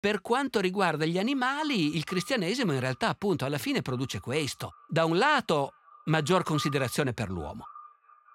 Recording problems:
echo of what is said; faint; throughout; 420 ms later, 20 dB below the speech

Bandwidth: 16 kHz